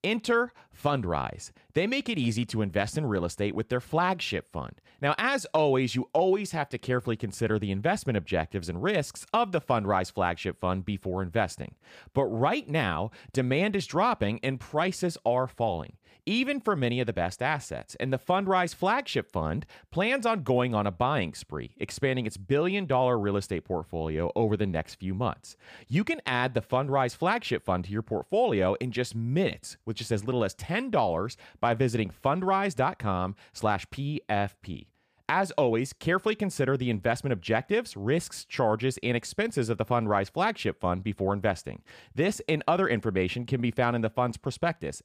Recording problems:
none

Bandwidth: 15 kHz